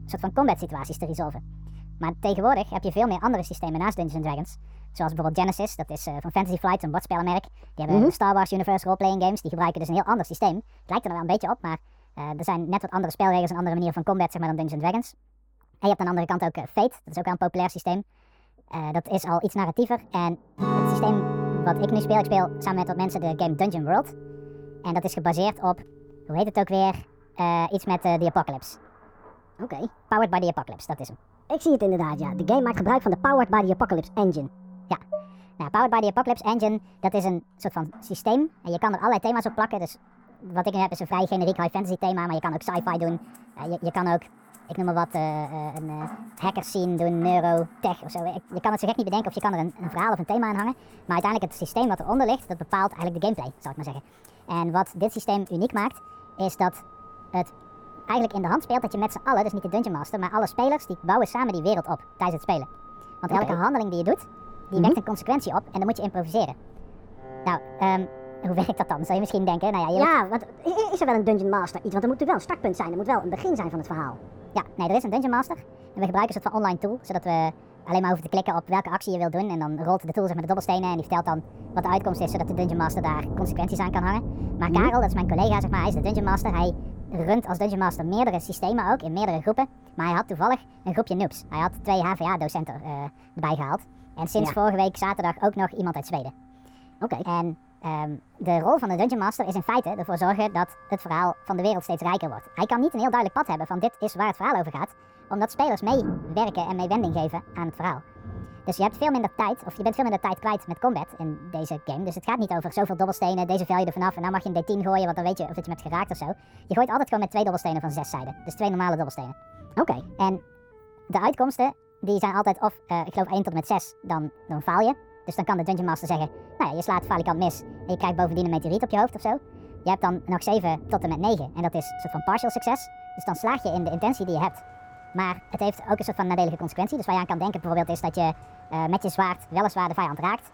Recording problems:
wrong speed and pitch; too fast and too high; 1.5 times normal speed
muffled; slightly; fading above 2 kHz
background music; noticeable; throughout; 15 dB below the speech
rain or running water; noticeable; throughout; 15 dB below the speech
clattering dishes; noticeable; at 35 s; peak 9 dB below the speech

